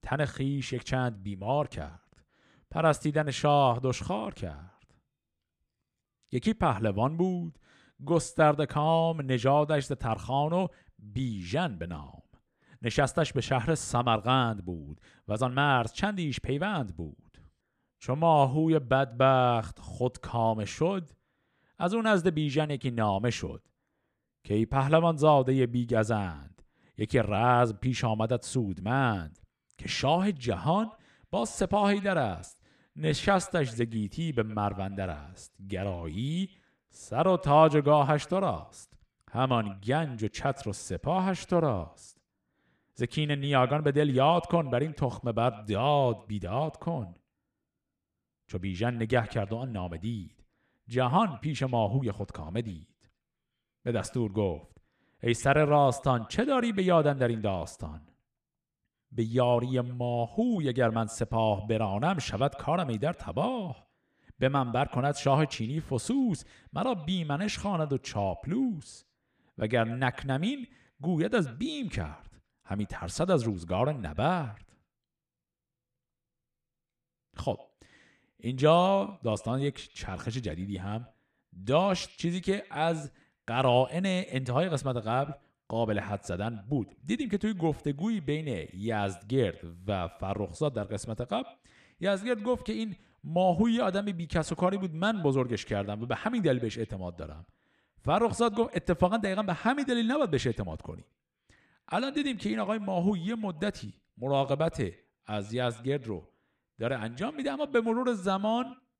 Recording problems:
echo of what is said; faint; from 31 s on; 120 ms later, 25 dB below the speech

